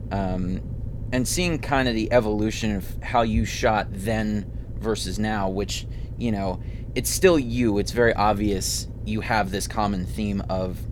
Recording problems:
low rumble; faint; throughout; 20 dB below the speech

